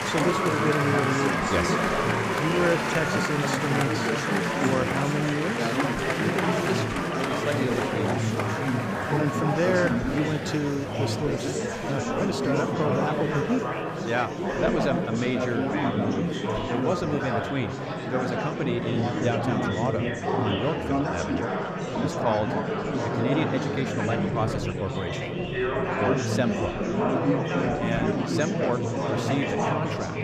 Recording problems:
murmuring crowd; very loud; throughout; 3 dB above the speech

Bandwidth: 15.5 kHz